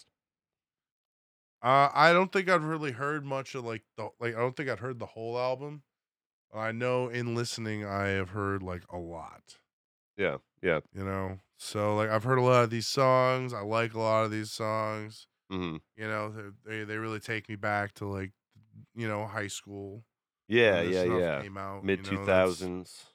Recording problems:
none

